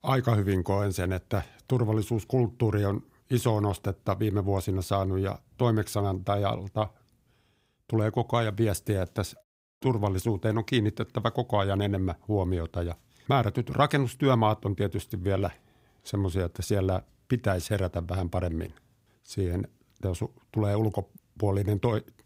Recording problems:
none

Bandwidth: 15.5 kHz